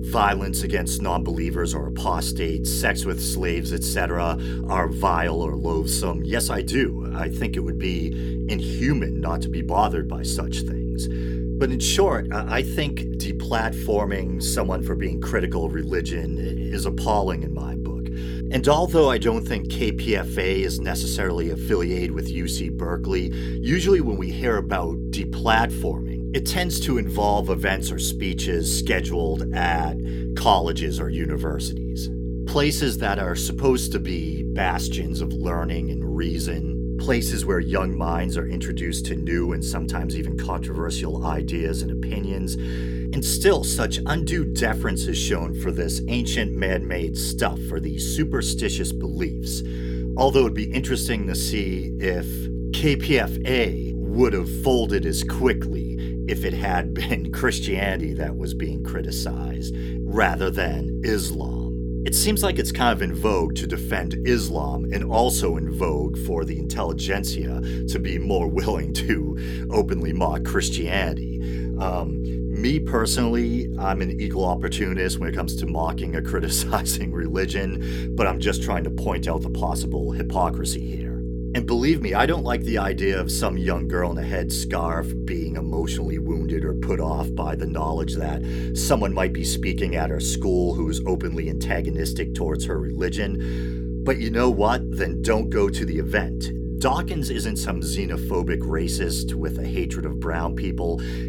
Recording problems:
electrical hum; loud; throughout; 60 Hz, 10 dB below the speech

